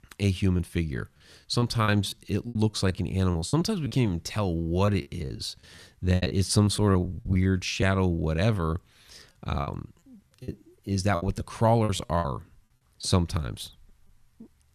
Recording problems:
choppy; very; 12% of the speech affected

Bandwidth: 14 kHz